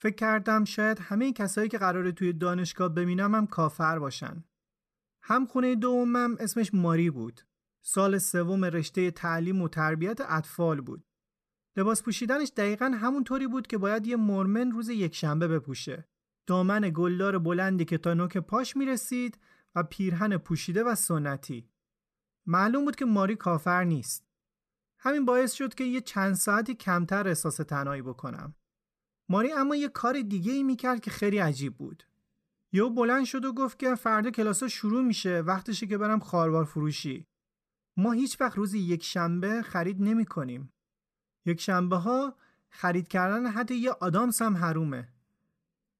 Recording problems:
none

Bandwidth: 14 kHz